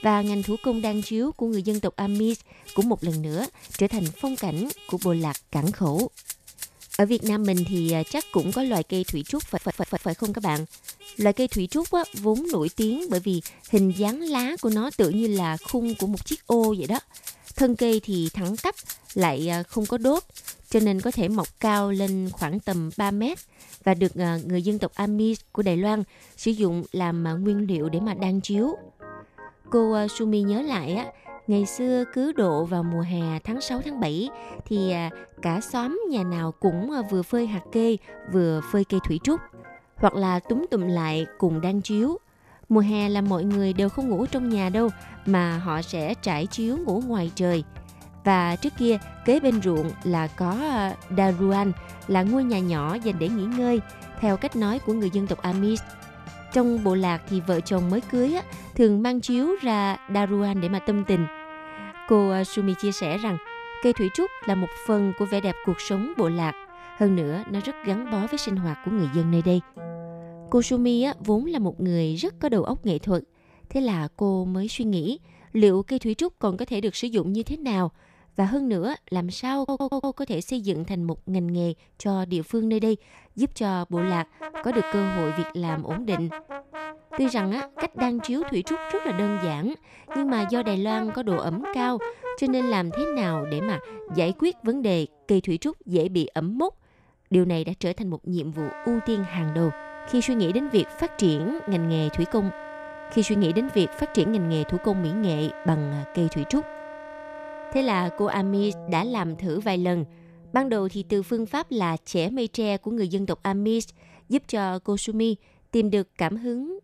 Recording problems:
background music; noticeable; throughout; 15 dB below the speech
traffic noise; faint; throughout; 20 dB below the speech
audio stuttering; at 9.5 s and at 1:20

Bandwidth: 14.5 kHz